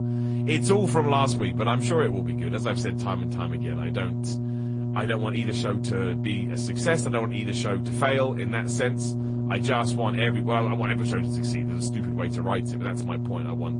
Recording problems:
garbled, watery; slightly; nothing above 9 kHz
electrical hum; loud; throughout; 60 Hz, 7 dB below the speech

